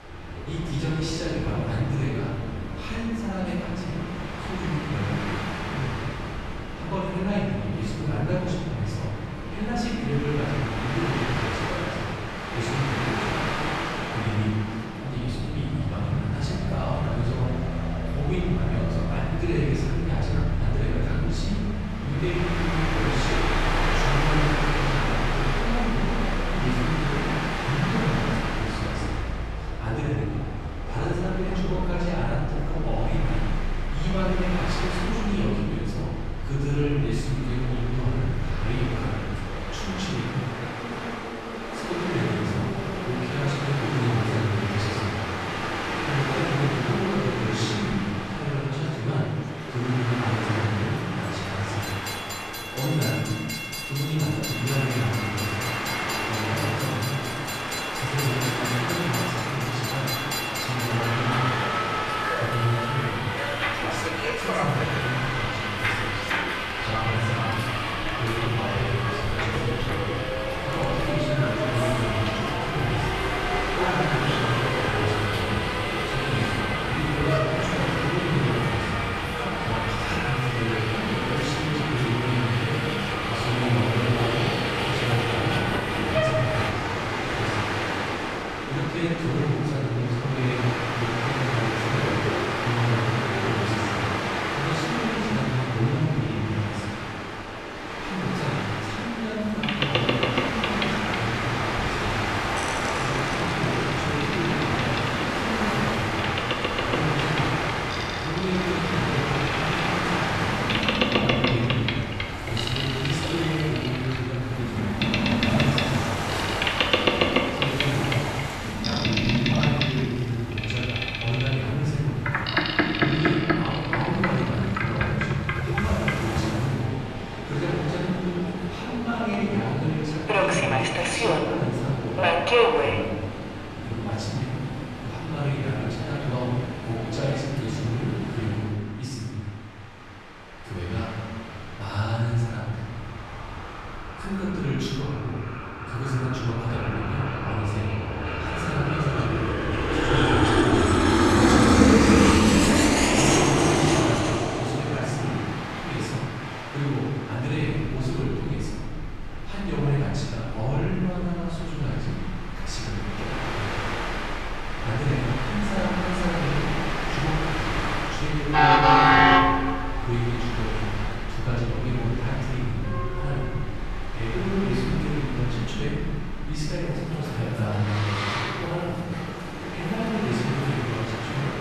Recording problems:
room echo; strong; dies away in 1.3 s
off-mic speech; far
train or aircraft noise; very loud; throughout; 2 dB above the speech
electrical hum; very faint; throughout; 60 Hz, 25 dB below the speech

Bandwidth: 13.5 kHz